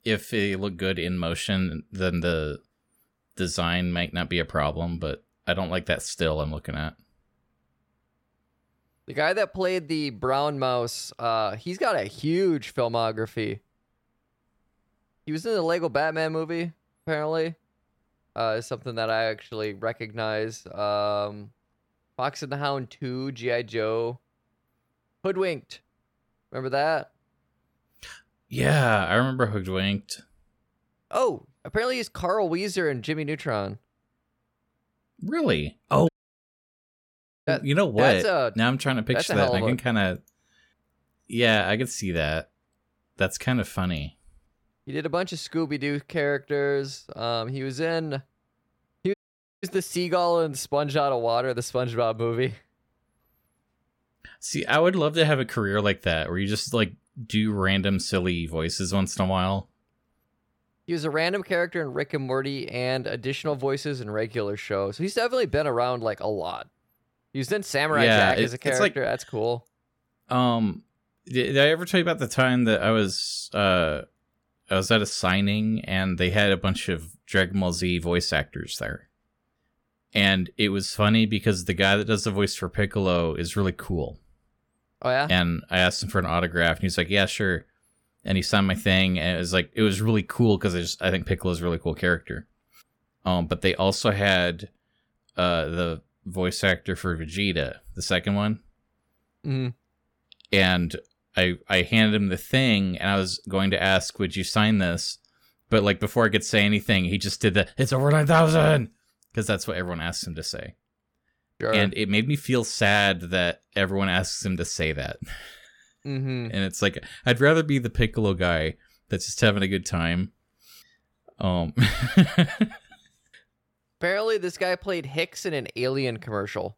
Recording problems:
audio cutting out; at 36 s for 1.5 s and at 49 s

